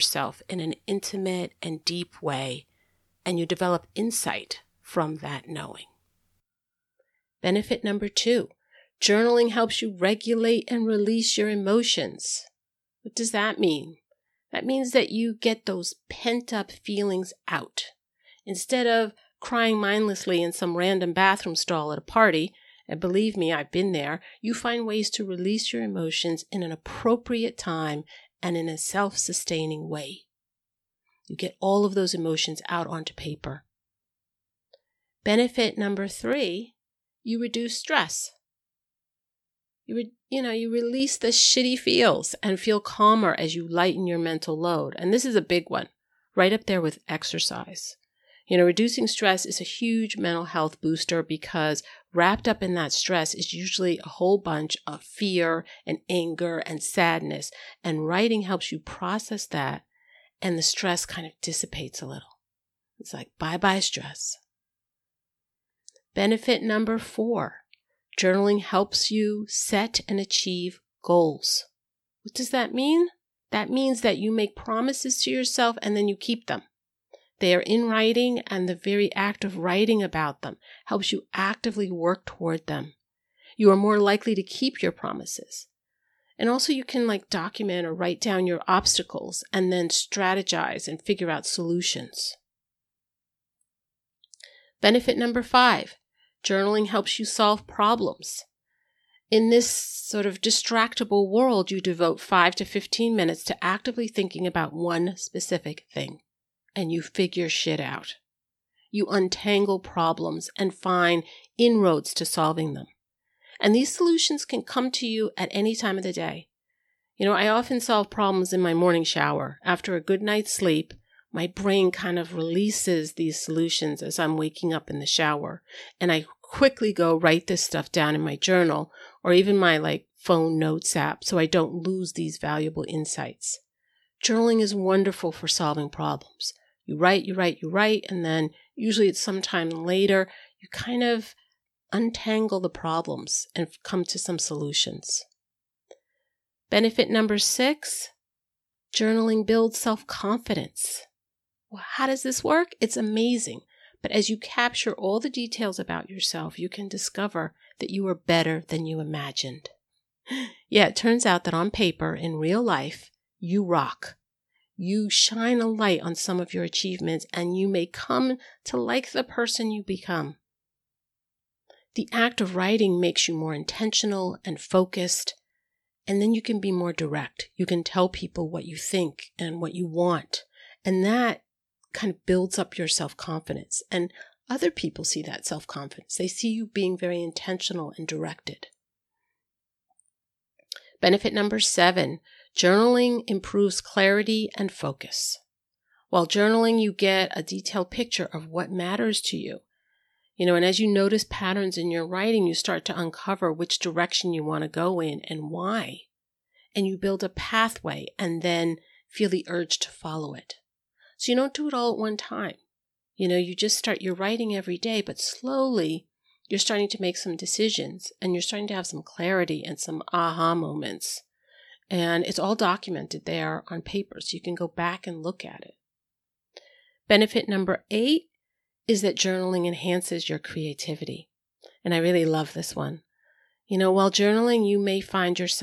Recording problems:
abrupt cut into speech; at the start and the end

